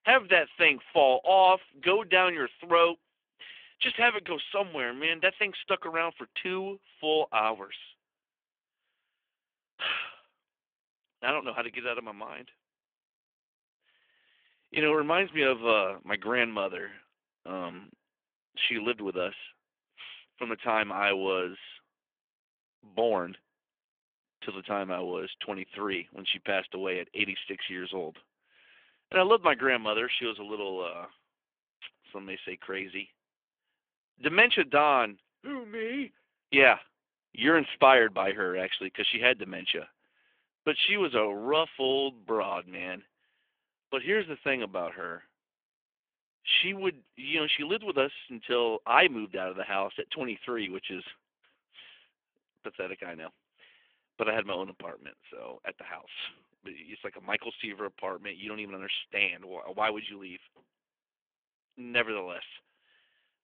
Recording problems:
phone-call audio; nothing above 3.5 kHz

